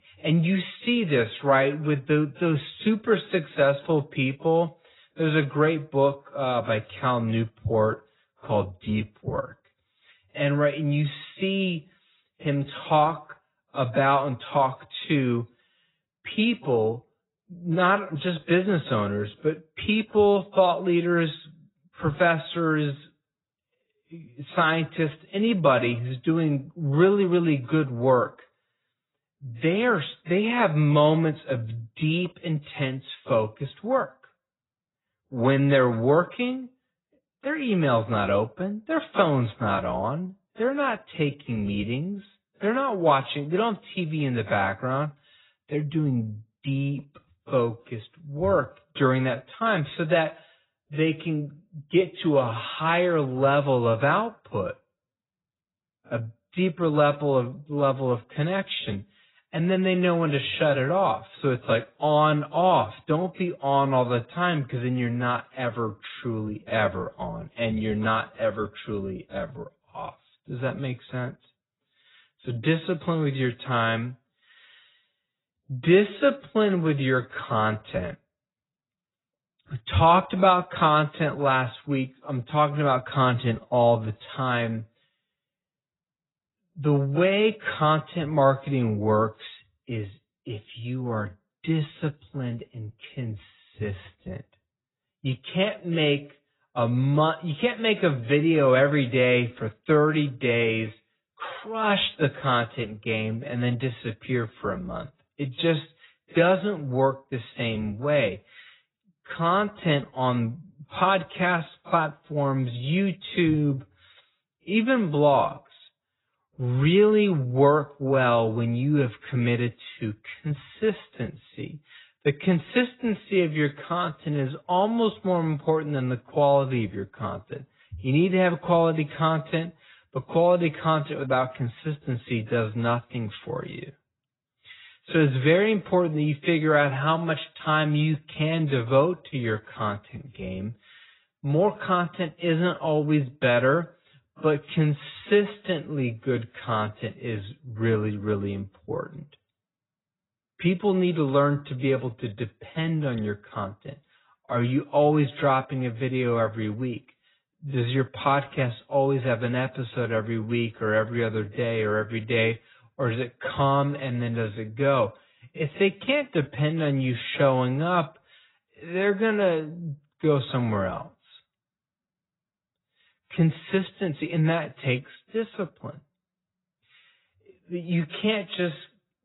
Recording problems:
garbled, watery; badly; nothing above 4 kHz
wrong speed, natural pitch; too slow; 0.7 times normal speed

